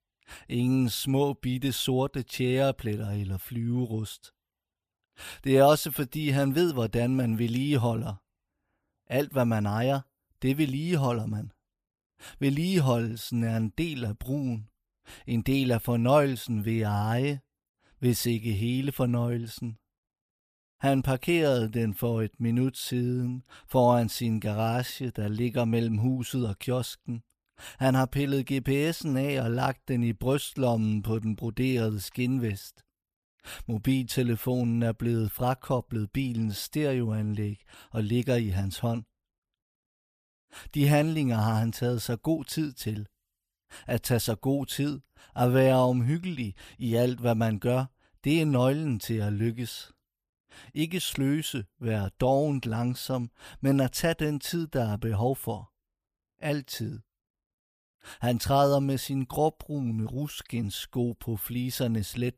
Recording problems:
none

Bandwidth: 15 kHz